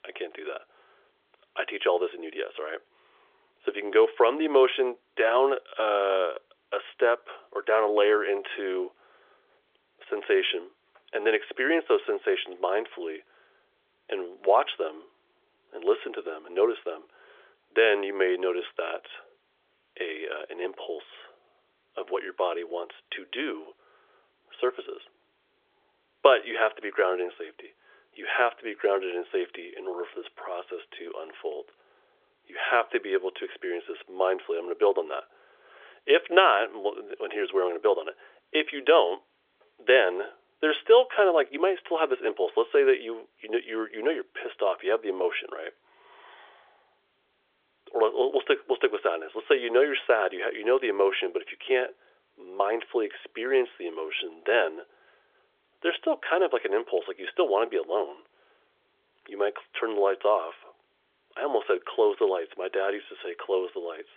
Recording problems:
phone-call audio; nothing above 3.5 kHz

